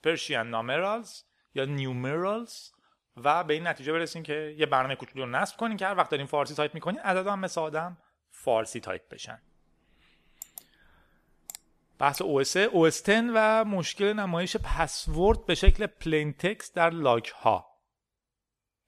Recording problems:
none

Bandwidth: 14.5 kHz